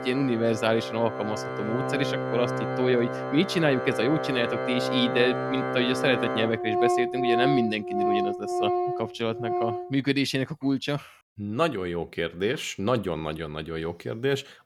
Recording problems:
background music; loud; until 10 s; 1 dB below the speech

